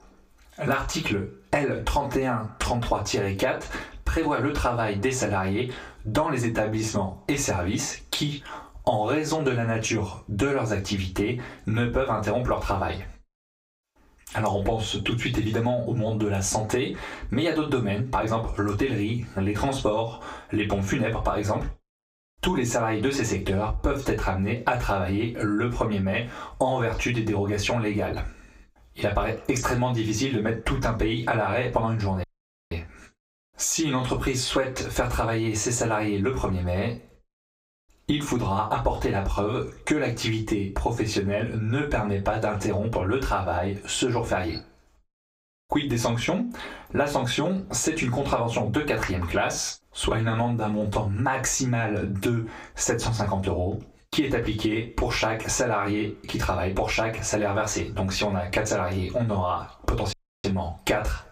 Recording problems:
off-mic speech; far
squashed, flat; heavily
room echo; slight; dies away in 0.2 s
audio cutting out; at 32 s and at 1:00

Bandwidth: 15.5 kHz